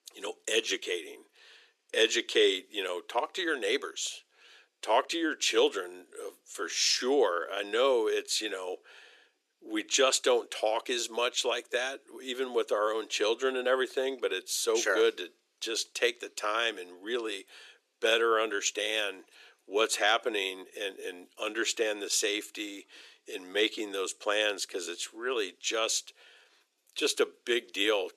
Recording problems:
thin; very; fading below 350 Hz

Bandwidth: 13.5 kHz